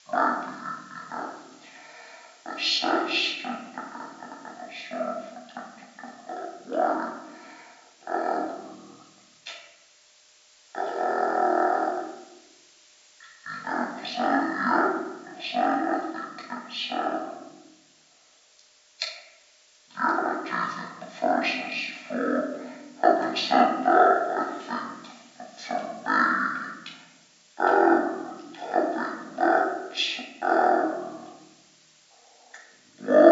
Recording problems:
off-mic speech; far
wrong speed and pitch; too slow and too low; 0.5 times normal speed
room echo; noticeable; dies away in 0.9 s
thin; somewhat; fading below 250 Hz
hiss; faint; throughout; 30 dB below the speech
abrupt cut into speech; at the end

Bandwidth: 7.5 kHz